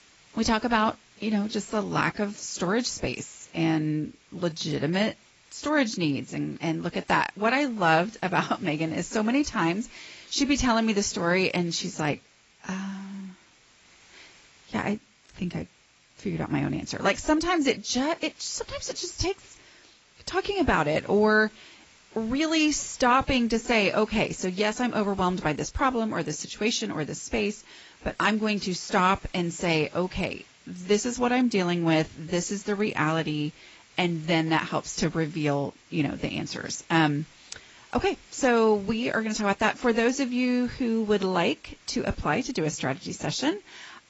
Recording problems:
garbled, watery; badly; nothing above 7.5 kHz
hiss; faint; throughout; 25 dB below the speech

